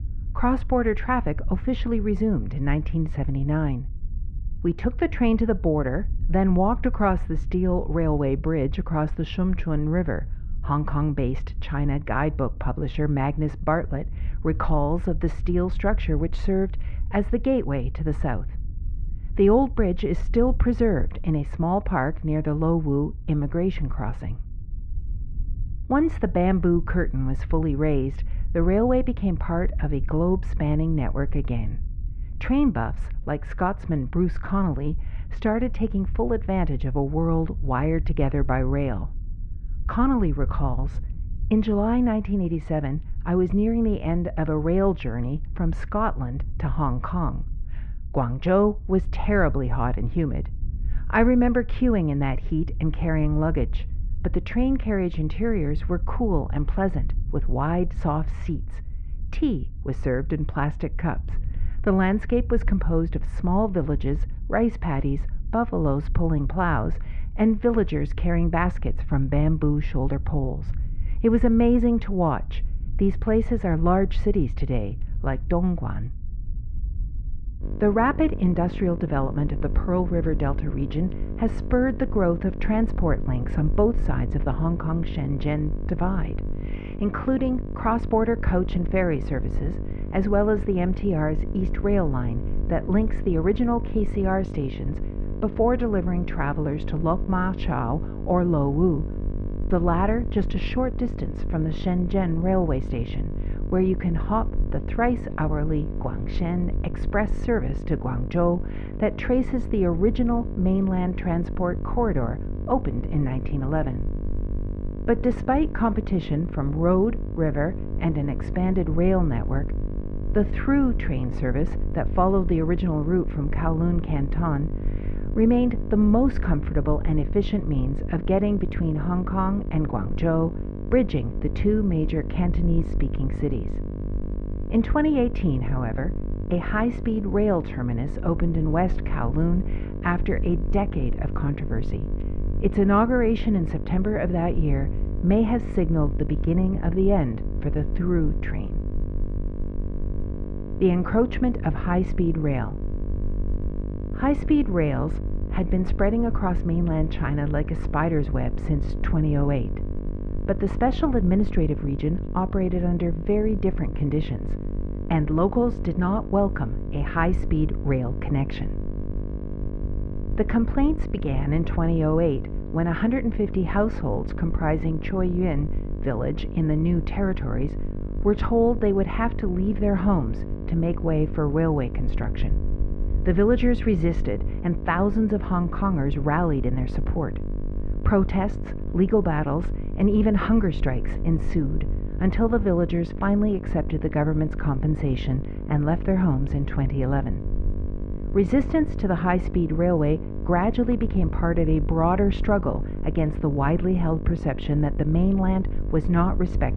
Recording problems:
muffled; very; fading above 2 kHz
electrical hum; noticeable; from 1:18 on; 50 Hz, 15 dB below the speech
low rumble; faint; throughout; 25 dB below the speech

